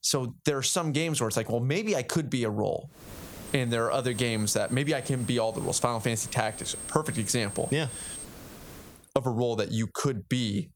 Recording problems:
squashed, flat; somewhat
high-pitched whine; noticeable; from 3.5 to 8 s; 8.5 kHz, 15 dB below the speech
hiss; noticeable; from 3 to 9 s; 20 dB below the speech

